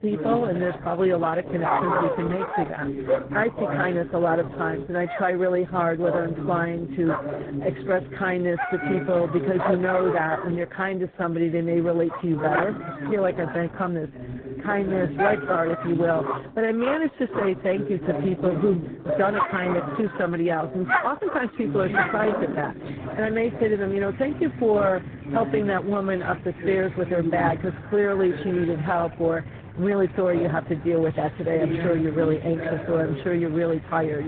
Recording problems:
garbled, watery; badly; nothing above 3.5 kHz
muffled; very slightly; fading above 1.5 kHz
animal sounds; loud; throughout; 7 dB below the speech
voice in the background; loud; throughout; 8 dB below the speech

